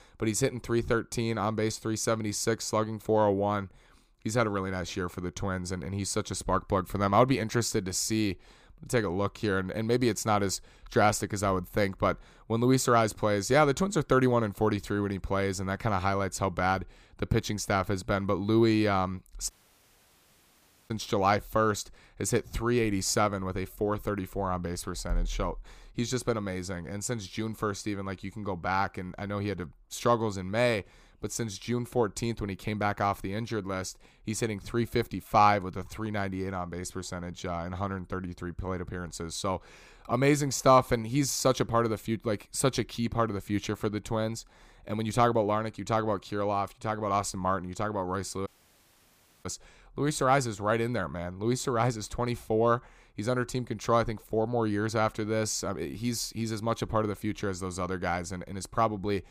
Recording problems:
audio cutting out; at 20 s for 1.5 s and at 48 s for 1 s

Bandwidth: 15 kHz